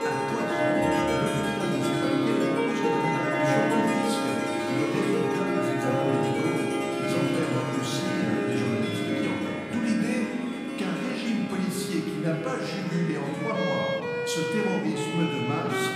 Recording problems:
room echo; noticeable; dies away in 1.9 s
off-mic speech; somewhat distant
background music; very loud; throughout; 2 dB above the speech
chatter from many people; faint; throughout; 20 dB below the speech

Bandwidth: 15.5 kHz